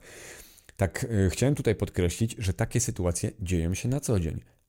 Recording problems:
none

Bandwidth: 16 kHz